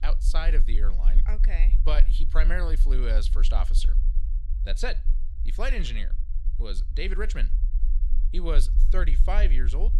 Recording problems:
low rumble; noticeable; throughout; 15 dB below the speech

